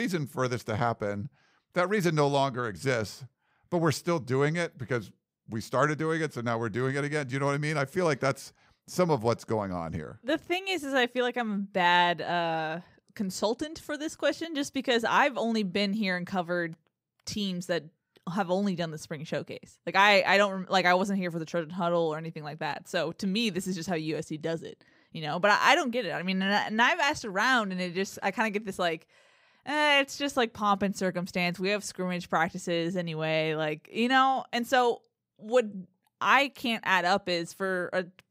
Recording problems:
abrupt cut into speech; at the start

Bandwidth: 15.5 kHz